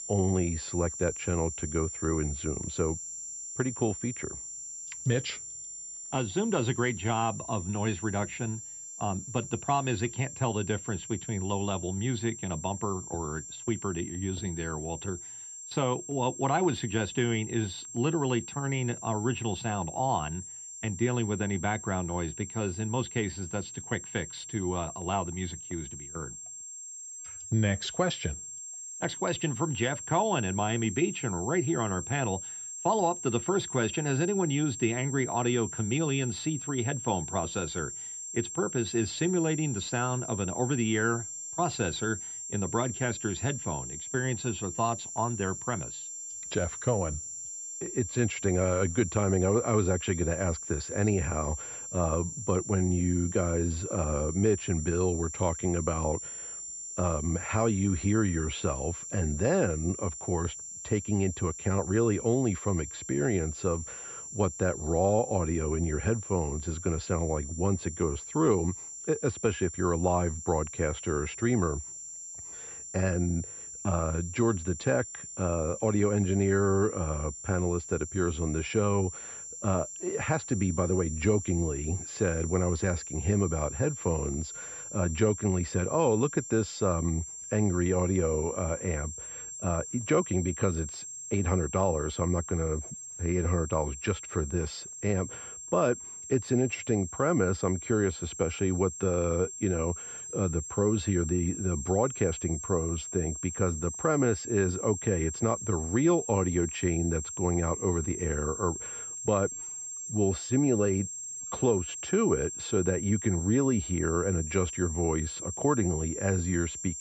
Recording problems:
muffled; slightly; fading above 2.5 kHz
high-pitched whine; loud; throughout; 7.5 kHz, 8 dB below the speech

